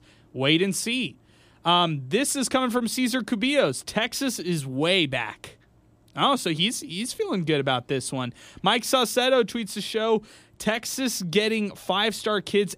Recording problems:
none

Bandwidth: 15 kHz